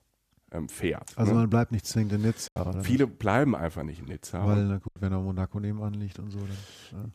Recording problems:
choppy; occasionally; at 2.5 s and at 5 s; 4% of the speech affected

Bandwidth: 14.5 kHz